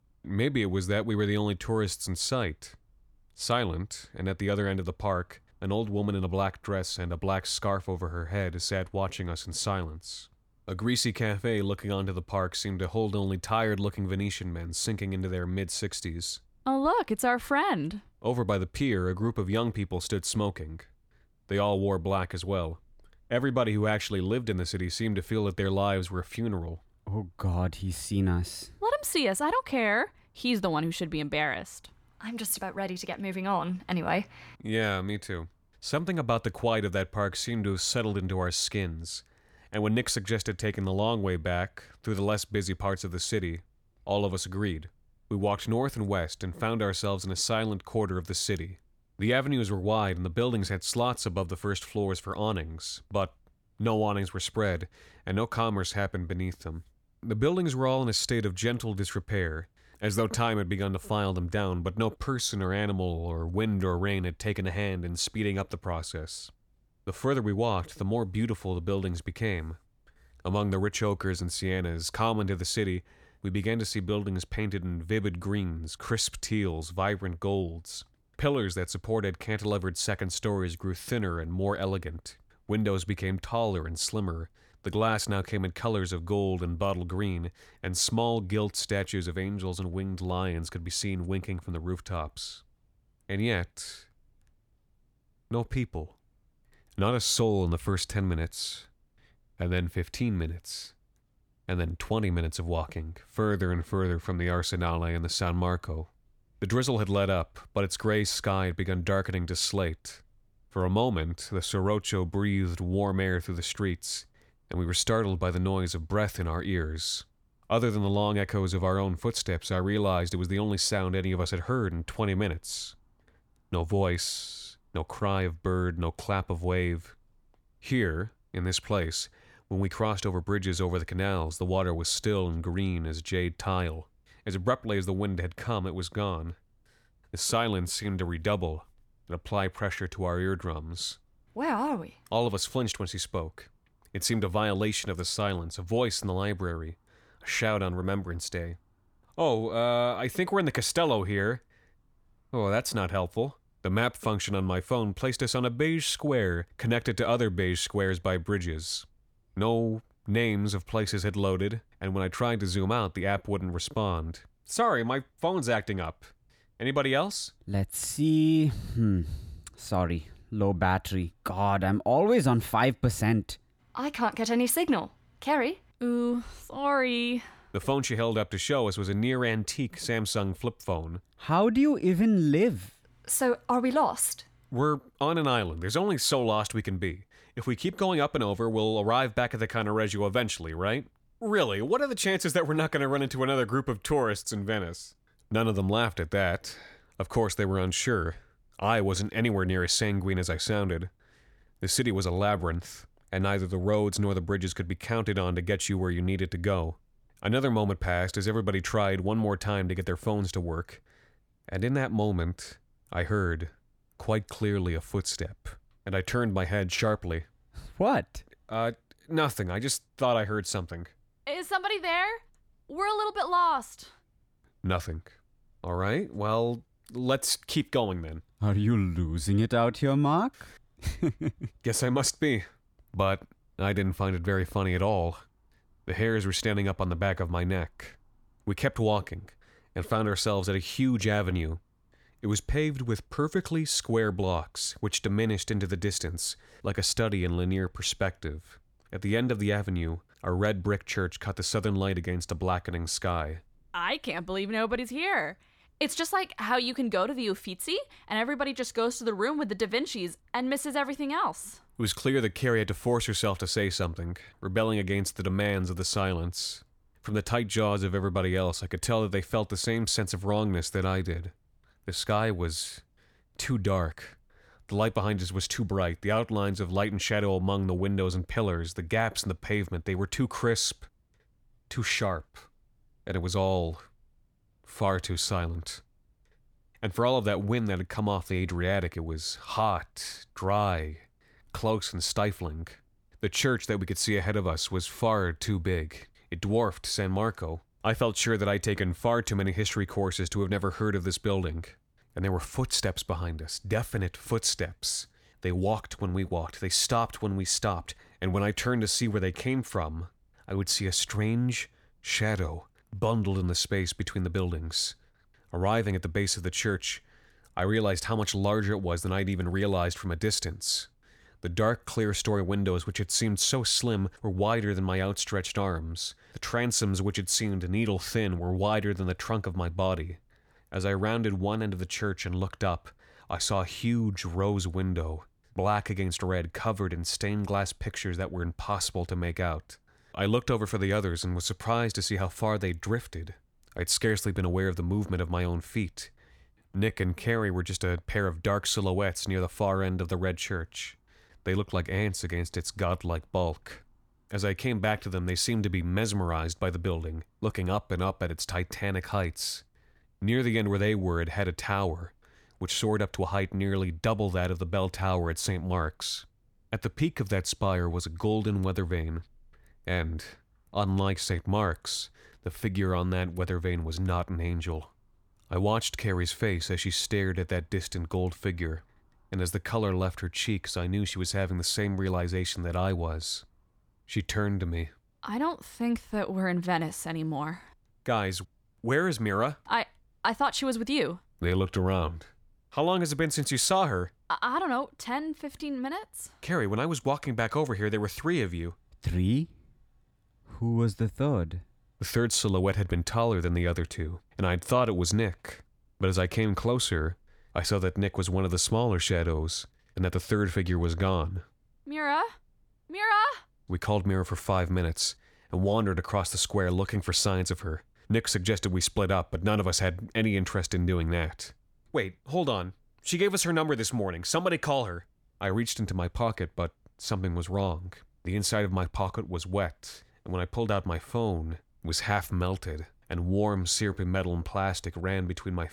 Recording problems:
uneven, jittery; strongly; from 35 s to 6:50

